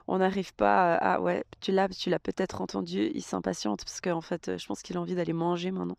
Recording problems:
none

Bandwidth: 14.5 kHz